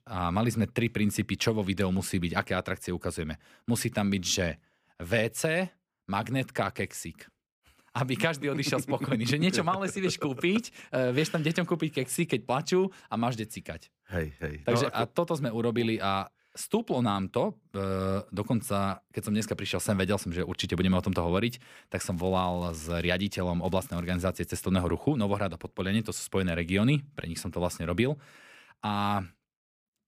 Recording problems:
crackling; faint; at 22 s and at 24 s; 30 dB below the speech

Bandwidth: 15 kHz